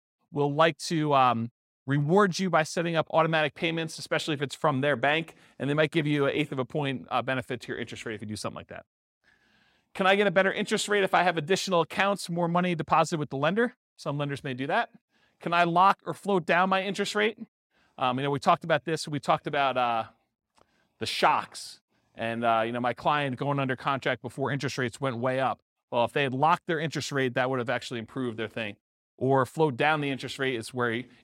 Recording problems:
none

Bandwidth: 16 kHz